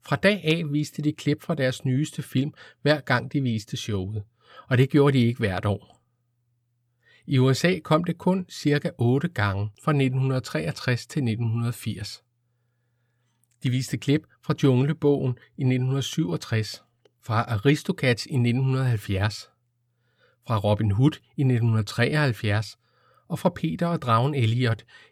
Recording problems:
none

